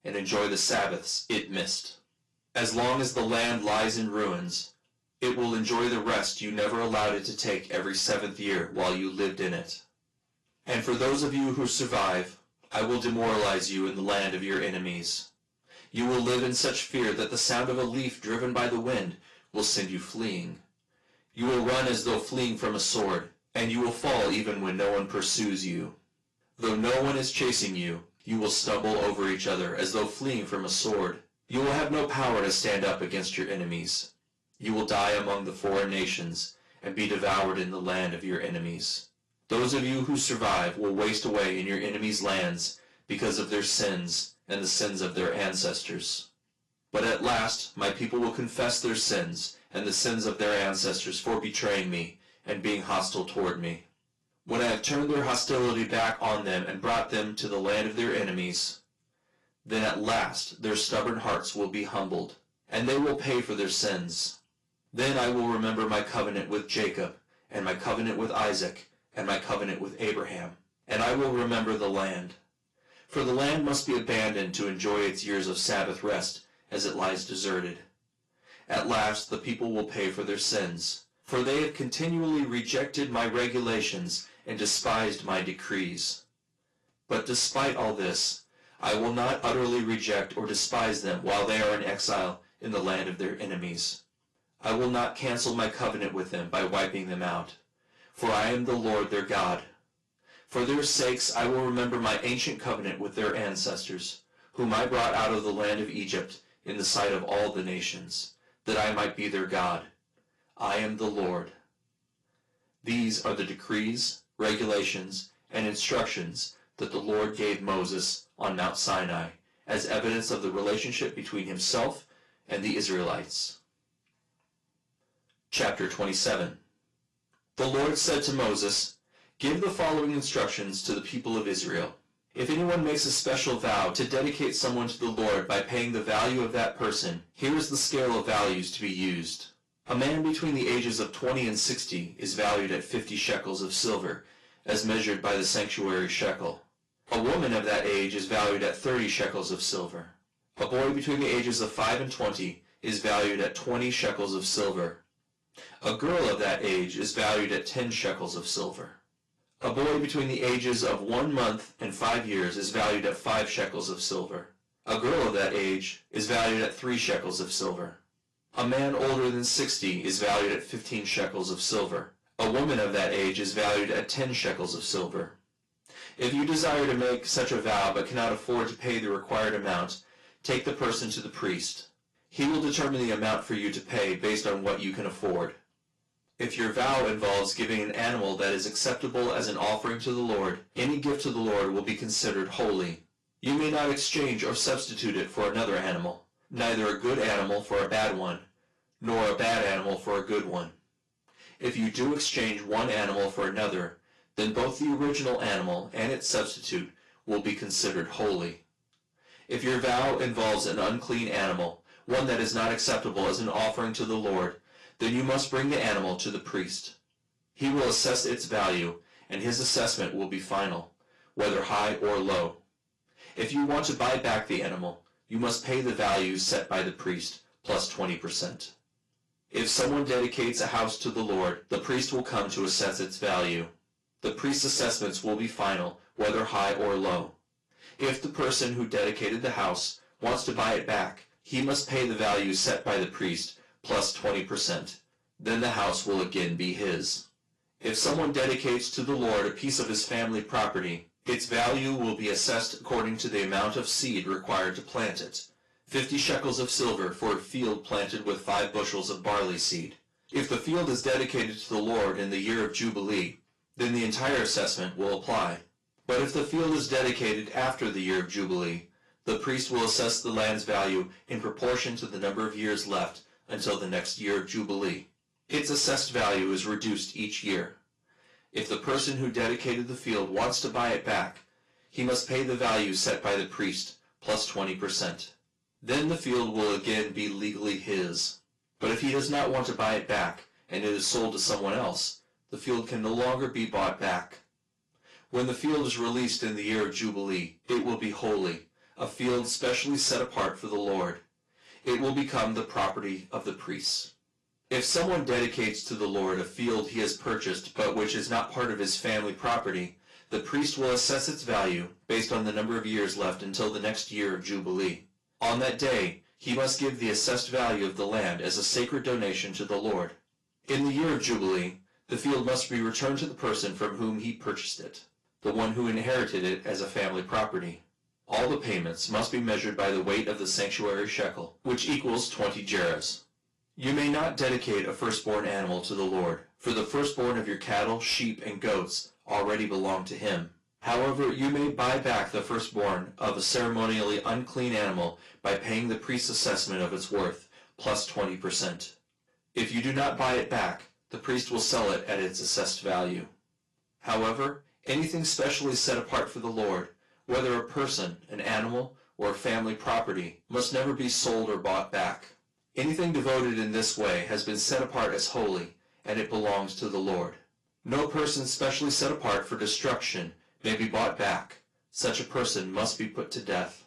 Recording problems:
distortion; heavy; 12% of the sound clipped
off-mic speech; far
room echo; very slight; dies away in 0.3 s
garbled, watery; slightly; nothing above 11 kHz

